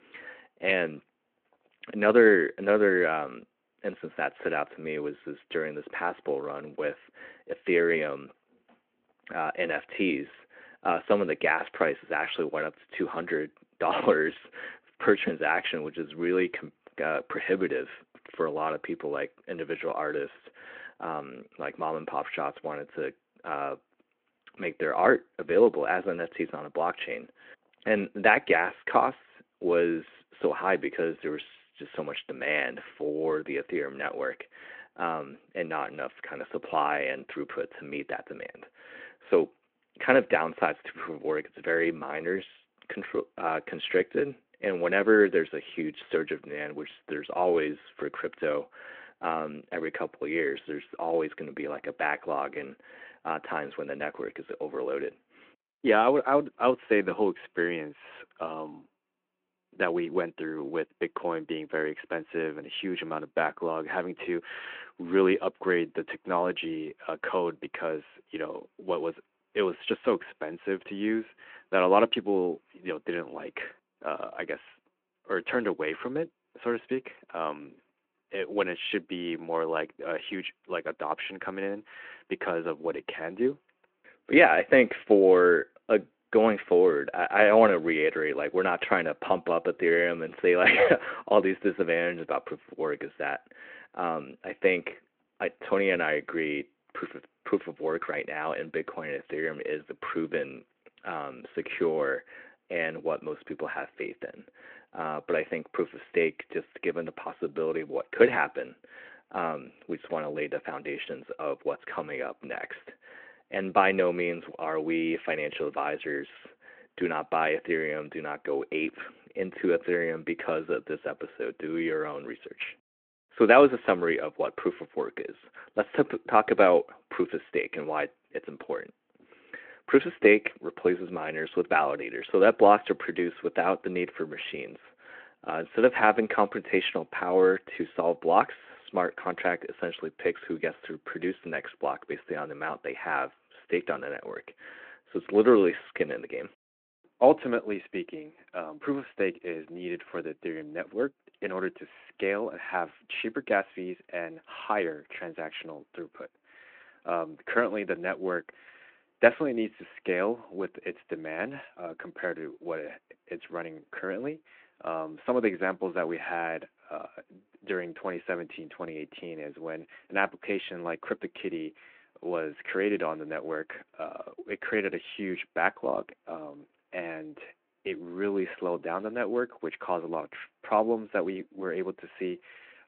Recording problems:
phone-call audio

